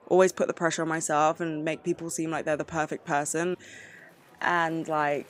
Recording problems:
murmuring crowd; faint; throughout; 25 dB below the speech

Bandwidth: 15.5 kHz